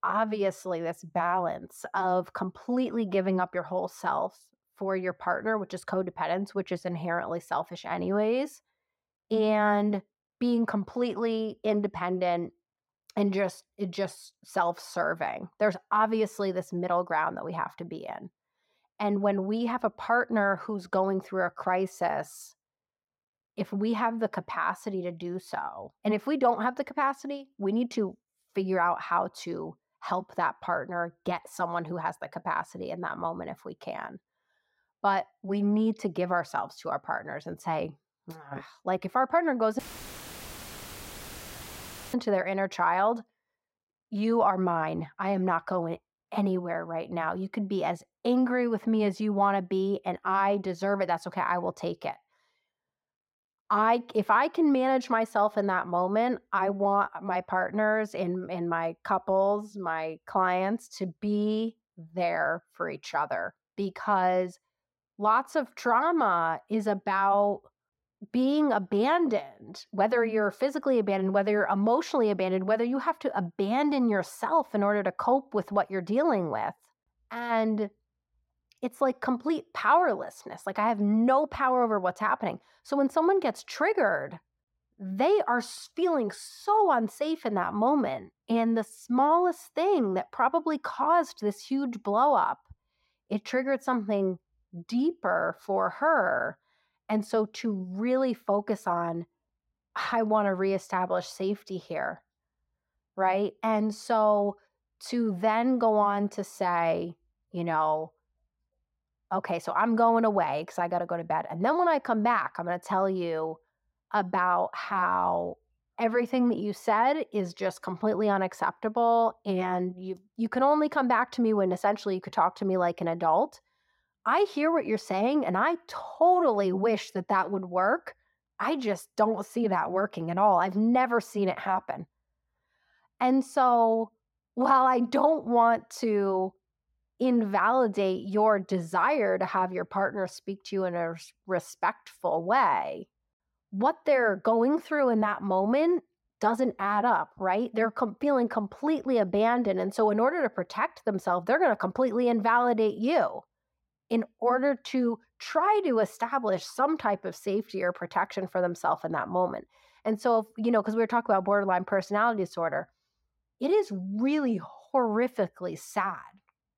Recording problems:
muffled; very; fading above 3 kHz
audio cutting out; filled with static; at 40 s for 2.5 s

